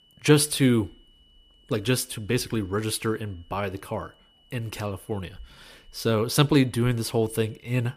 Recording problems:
high-pitched whine; faint; throughout; 3 kHz, 35 dB below the speech

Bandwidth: 14.5 kHz